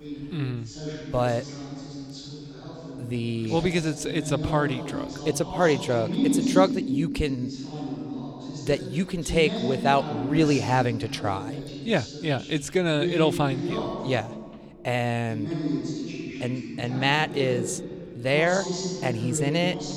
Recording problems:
voice in the background; loud; throughout; 5 dB below the speech

